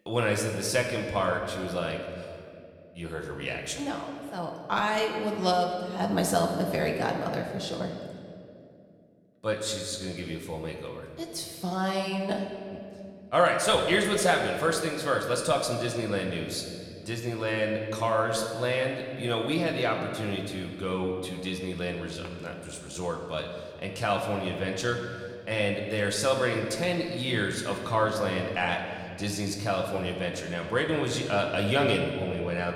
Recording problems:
room echo; slight; dies away in 1.8 s
off-mic speech; somewhat distant

